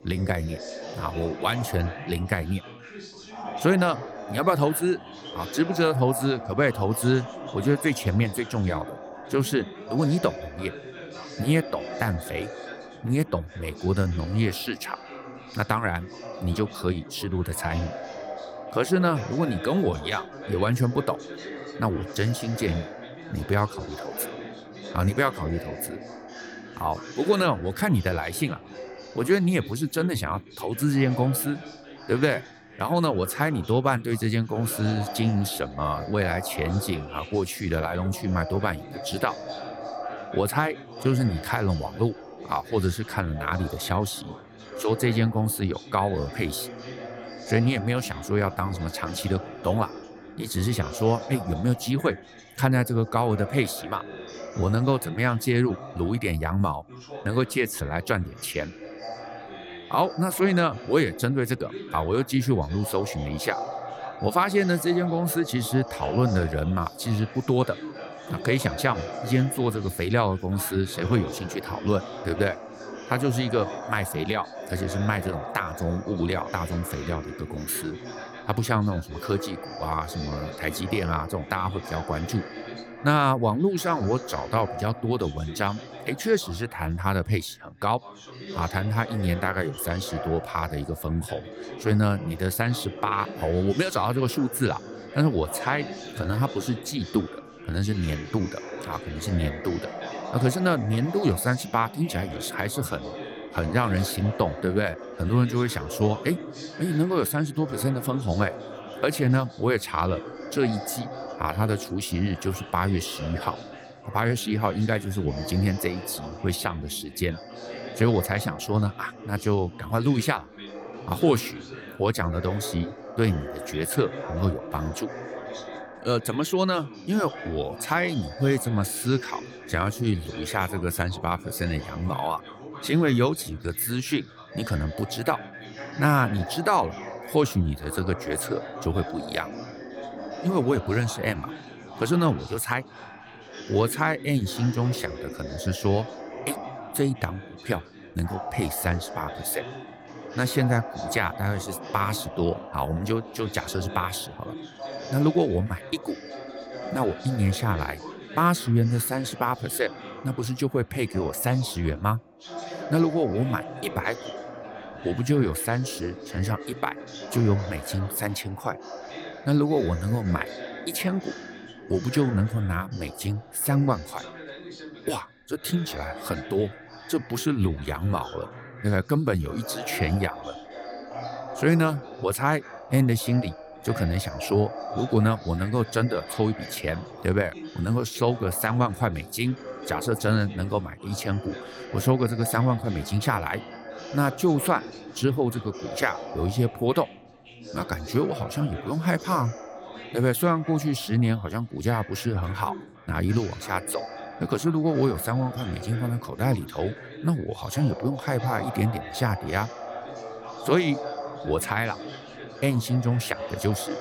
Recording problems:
background chatter; noticeable; throughout; 4 voices, 10 dB below the speech

